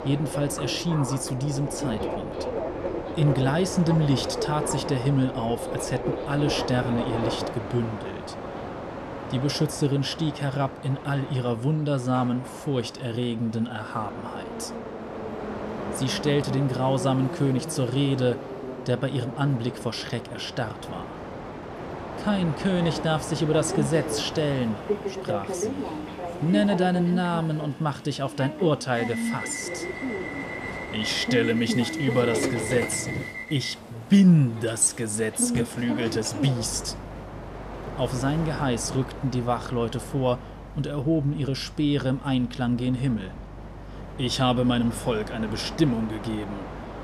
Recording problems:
train or aircraft noise; loud; throughout; 7 dB below the speech

